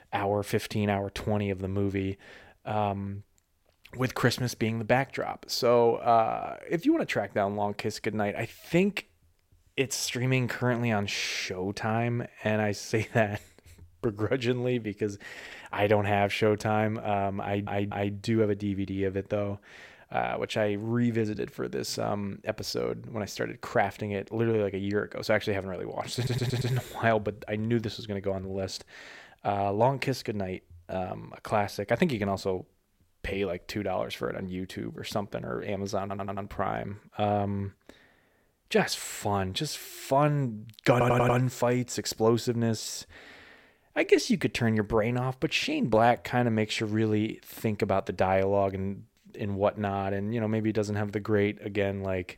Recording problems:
audio stuttering; 4 times, first at 17 s

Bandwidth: 16.5 kHz